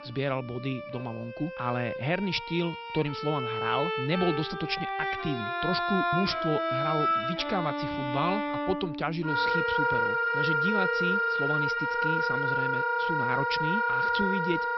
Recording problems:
high frequencies cut off; noticeable; nothing above 5.5 kHz
background music; very loud; throughout; 4 dB above the speech

